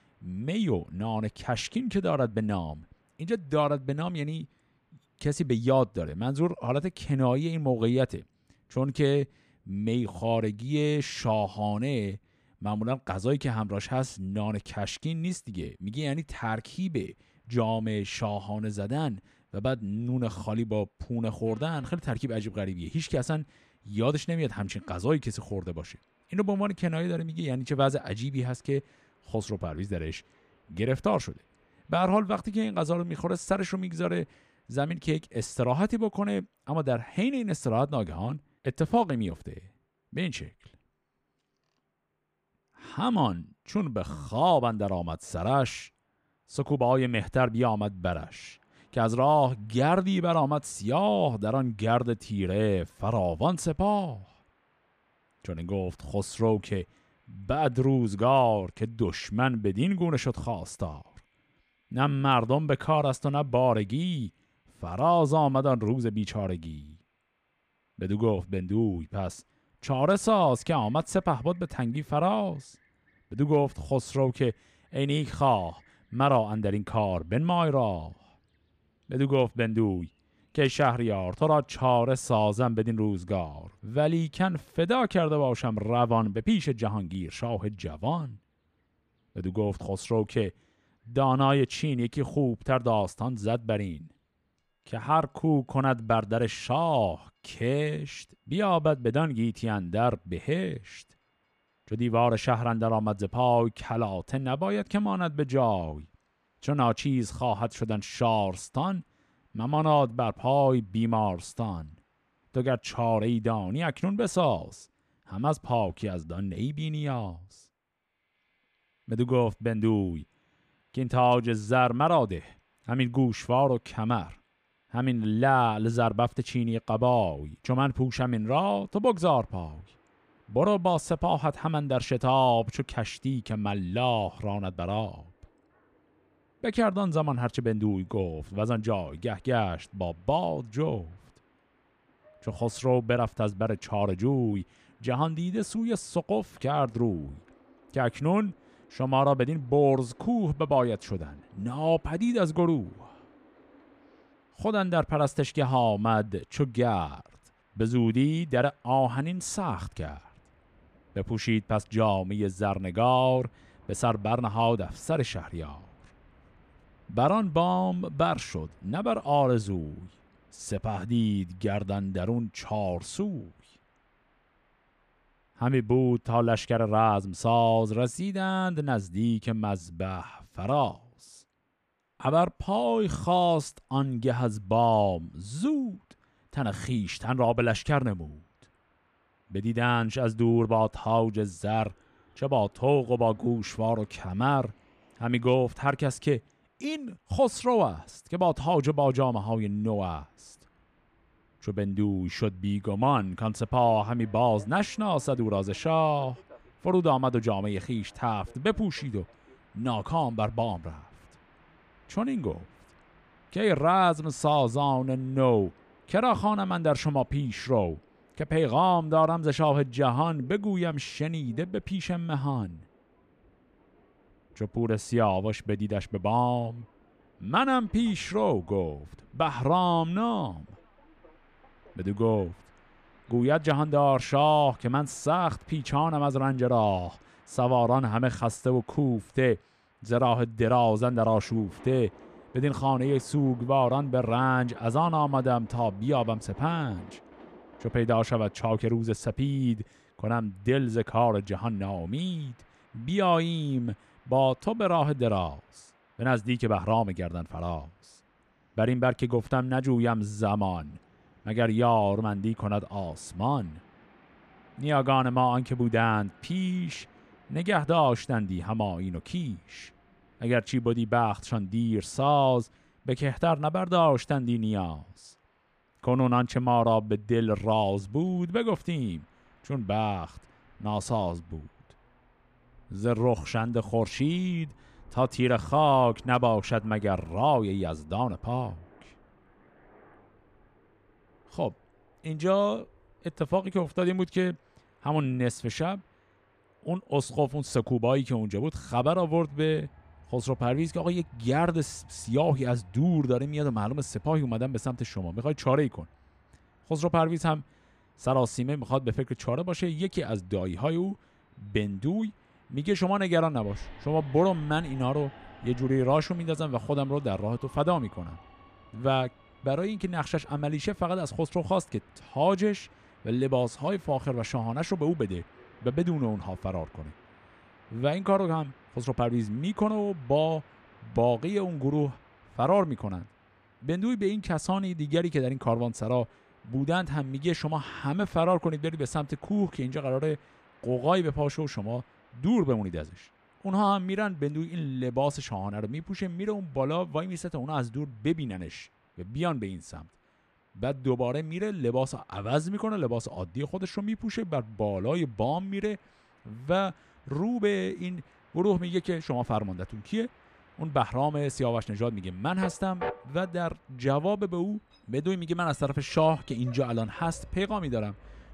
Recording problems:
train or aircraft noise; faint; throughout; 30 dB below the speech

